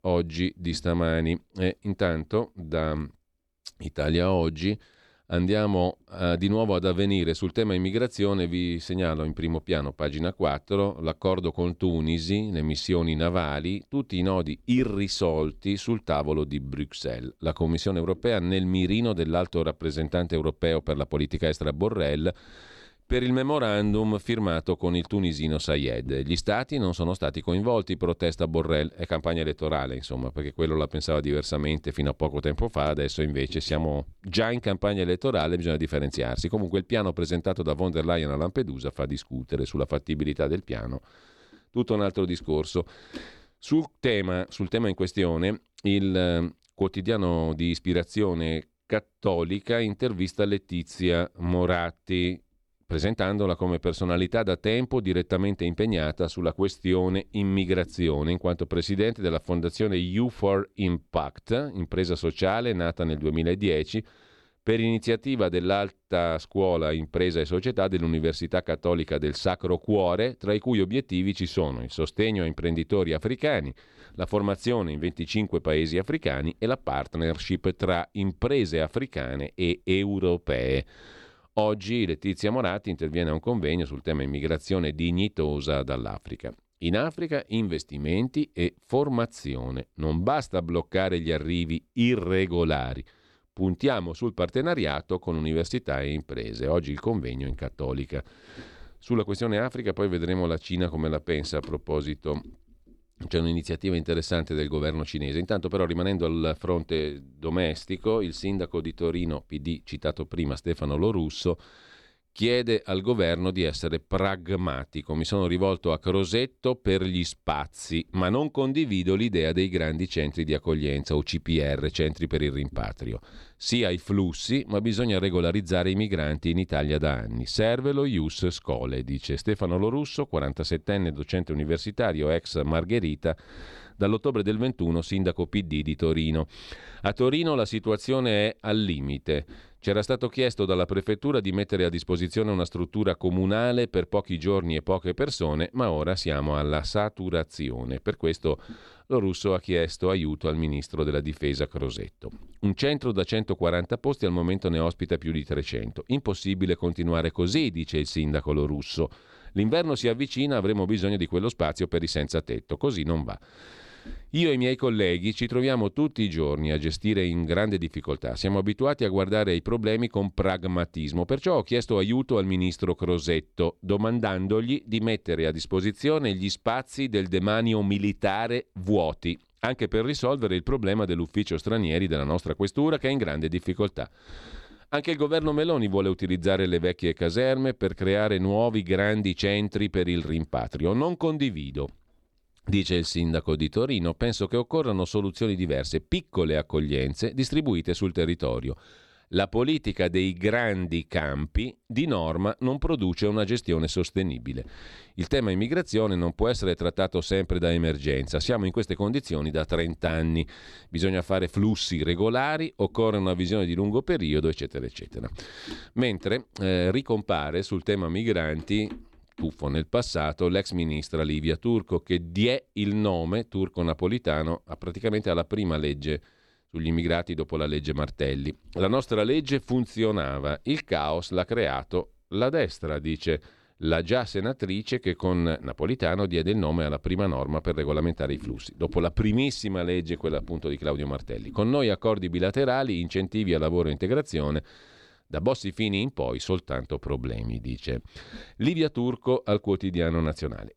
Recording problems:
none

